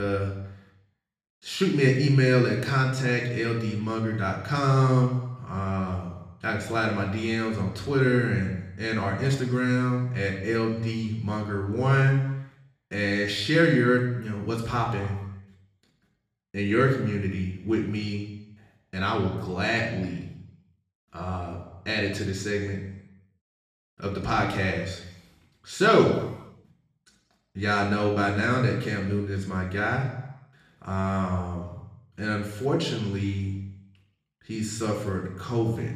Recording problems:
off-mic speech; far
room echo; noticeable; dies away in 0.9 s
abrupt cut into speech; at the start

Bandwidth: 14.5 kHz